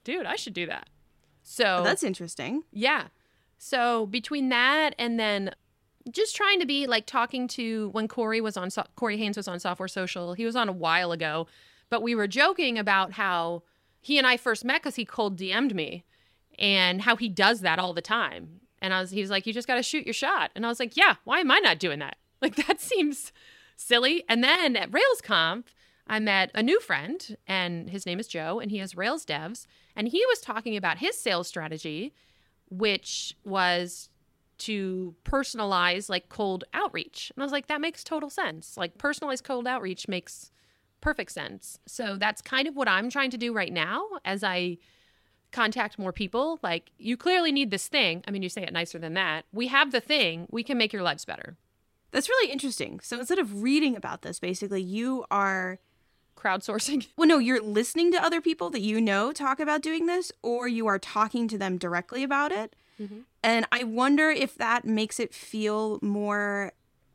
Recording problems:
none

